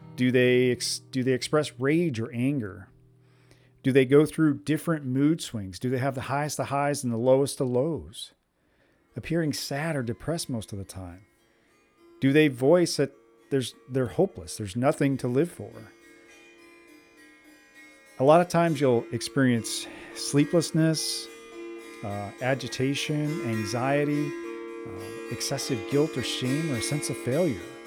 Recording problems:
background music; noticeable; throughout; 15 dB below the speech

